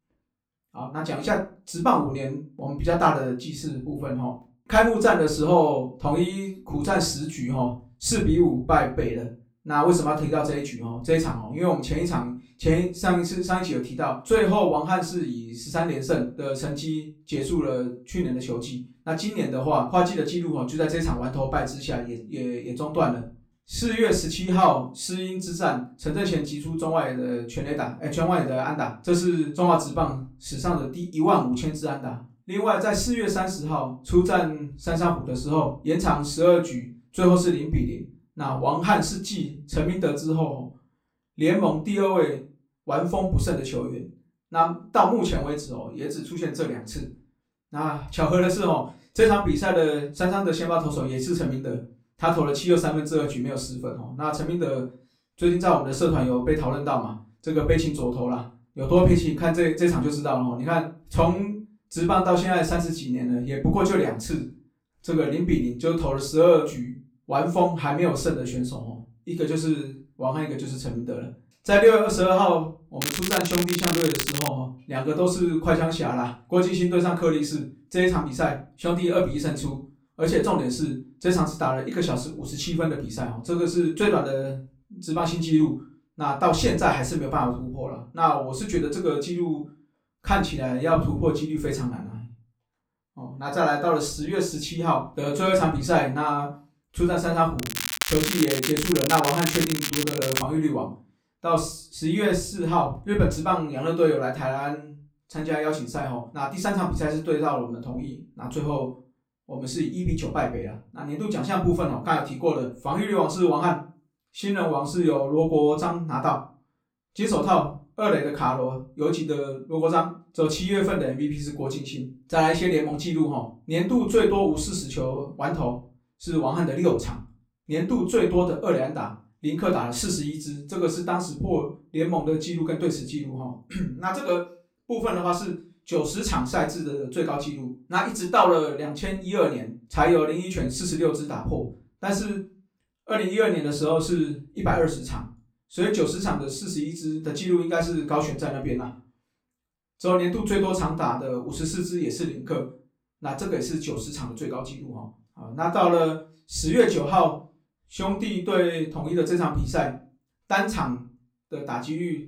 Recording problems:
off-mic speech; far
room echo; slight; dies away in 0.3 s
crackling; loud; from 1:13 to 1:14 and from 1:38 to 1:40; 3 dB below the speech

